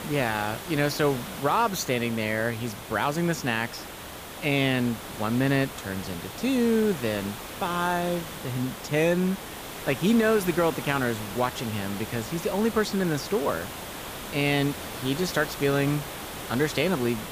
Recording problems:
hiss; loud; throughout; 10 dB below the speech

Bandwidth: 15 kHz